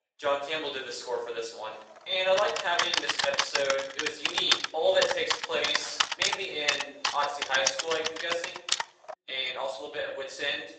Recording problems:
off-mic speech; far
thin; very; fading below 450 Hz
room echo; noticeable; dies away in 0.6 s
garbled, watery; slightly; nothing above 8 kHz
keyboard typing; loud; from 2.5 to 9 s; peak 4 dB above the speech

